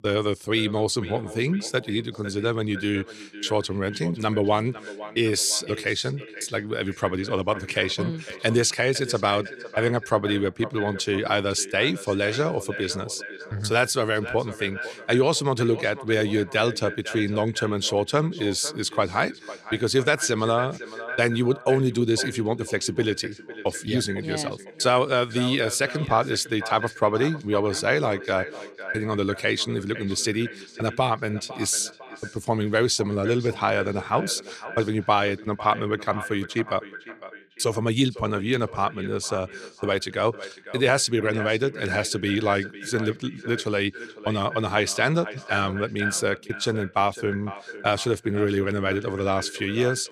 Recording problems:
echo of what is said; noticeable; throughout; 500 ms later, 15 dB below the speech

